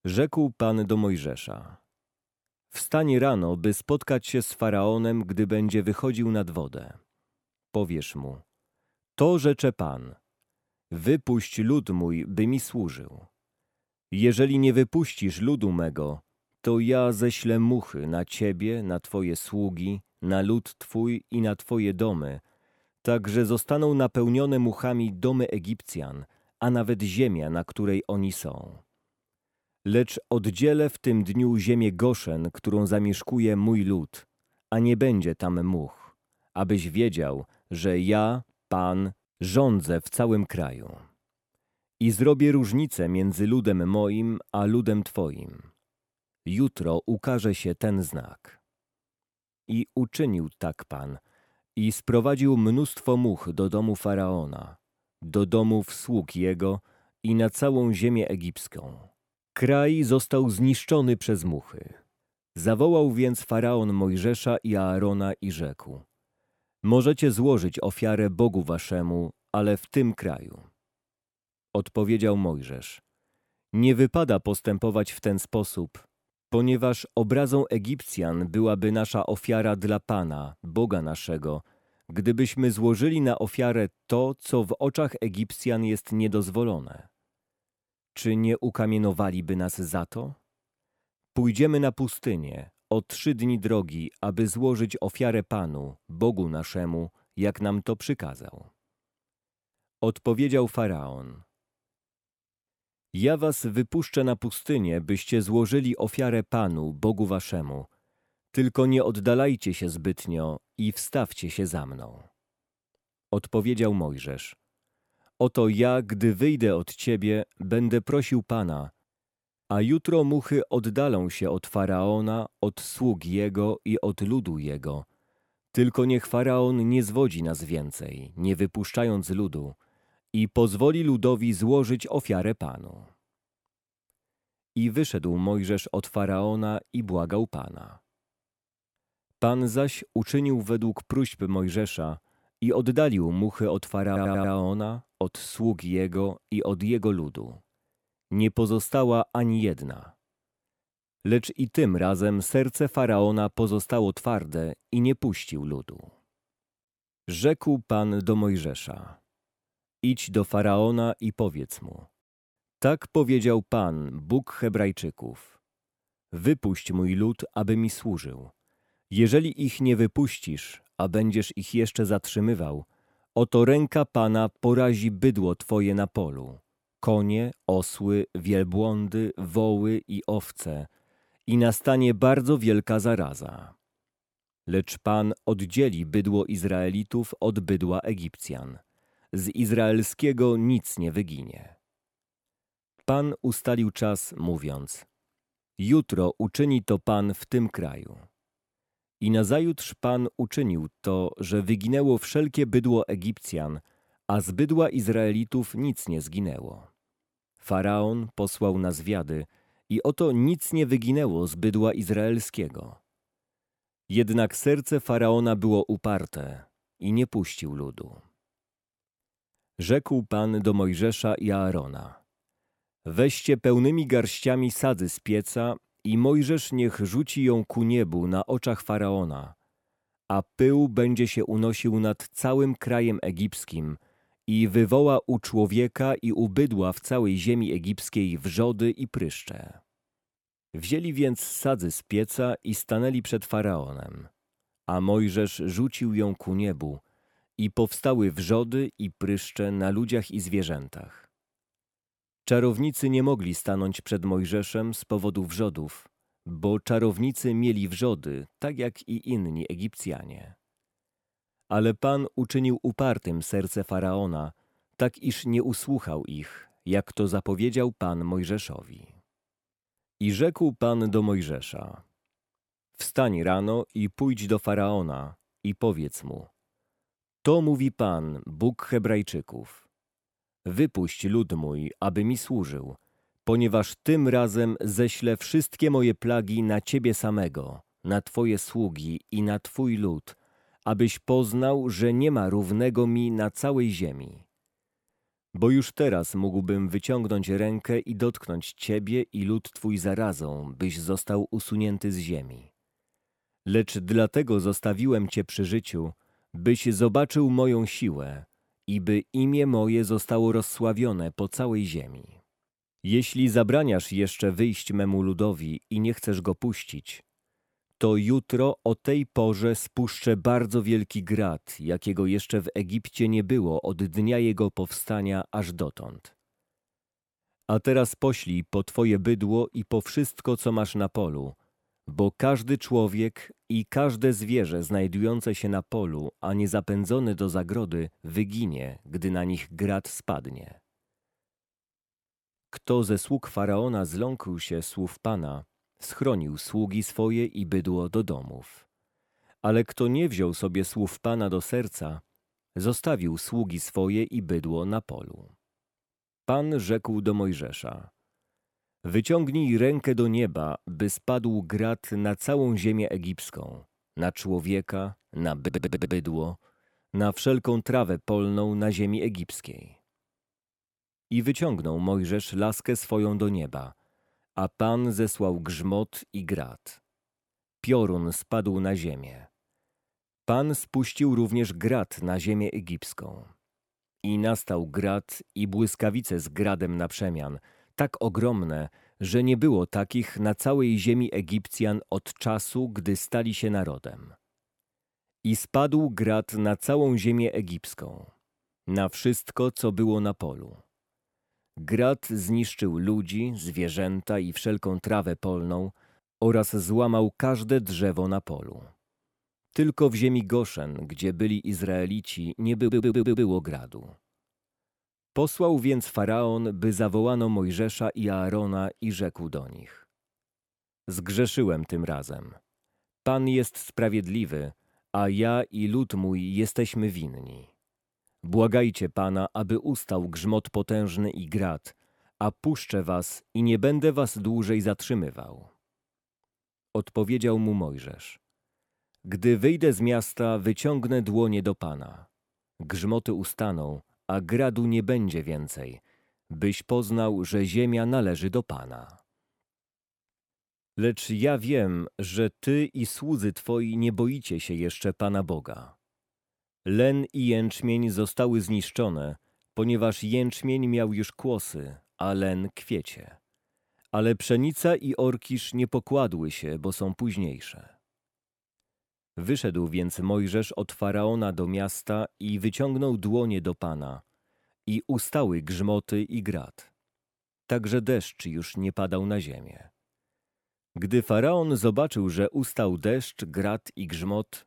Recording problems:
audio stuttering; at 2:24, at 6:06 and at 6:53

